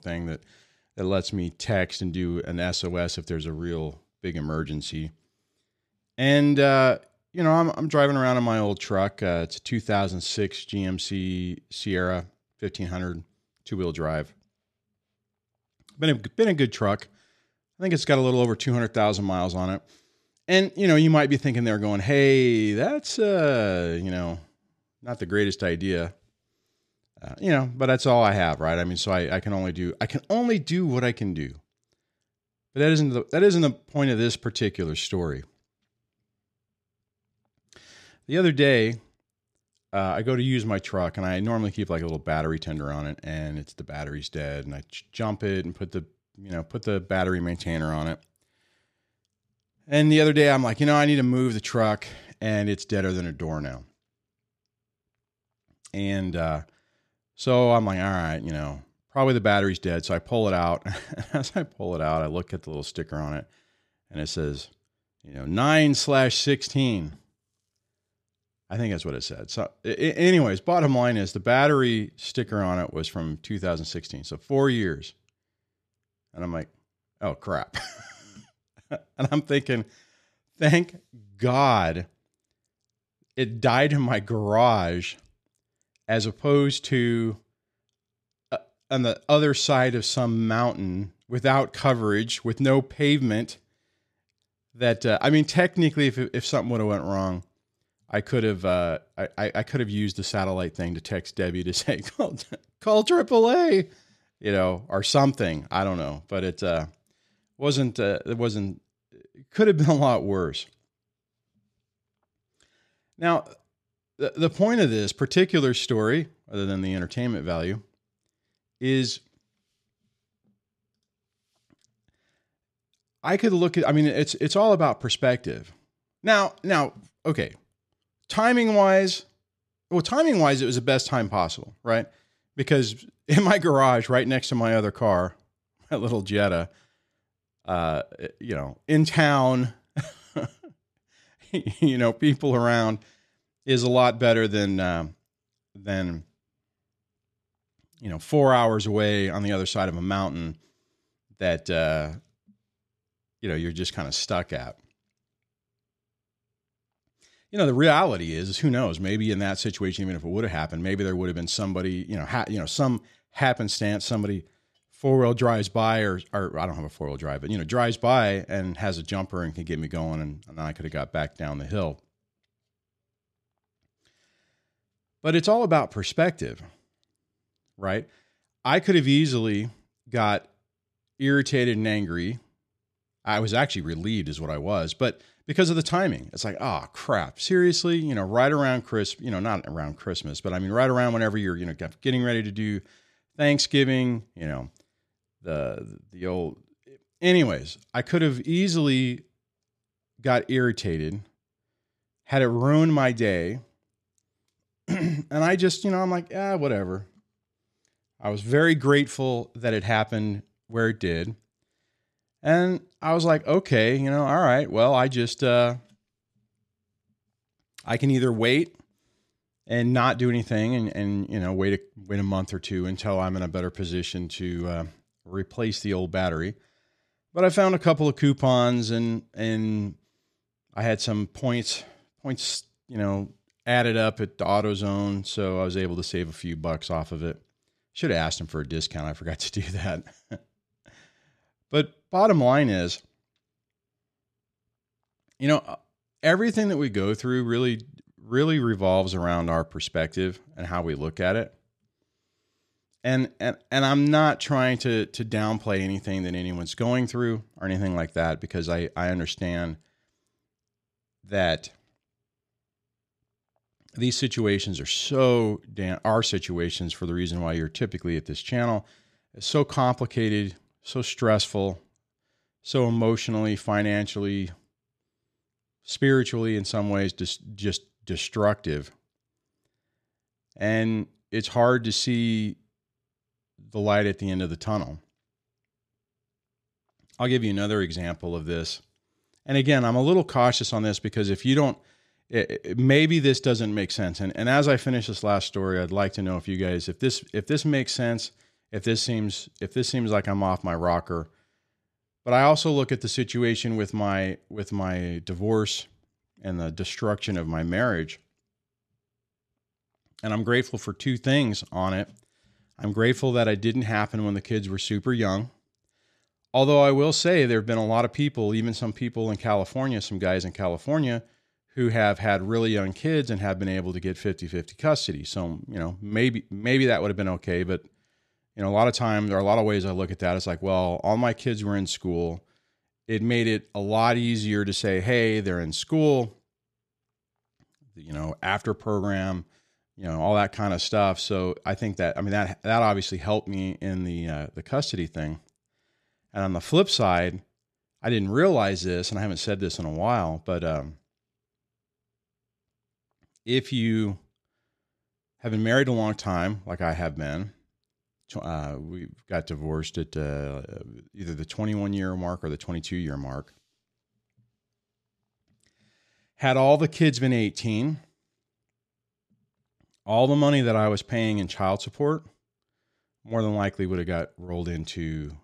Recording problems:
none

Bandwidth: 13.5 kHz